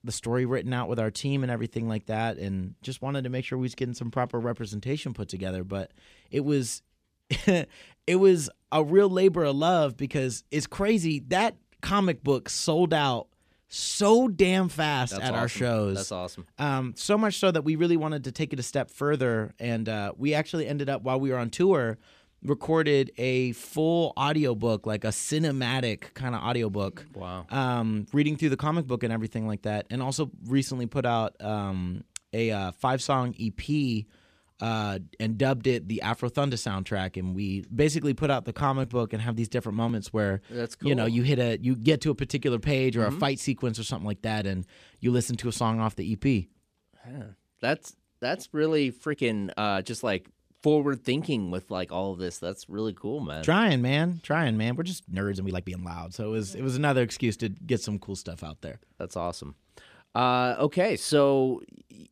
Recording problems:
uneven, jittery; strongly; from 38 to 56 s

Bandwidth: 14.5 kHz